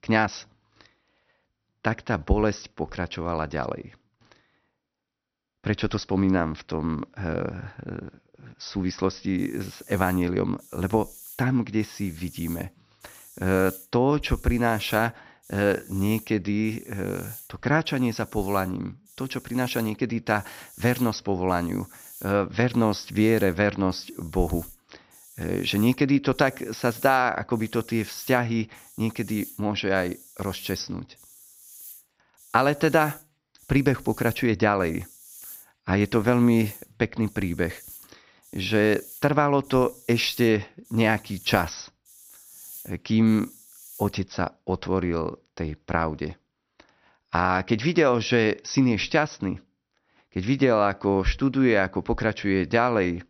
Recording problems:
high frequencies cut off; noticeable; nothing above 6 kHz
hiss; noticeable; from 9.5 to 44 s; 20 dB below the speech

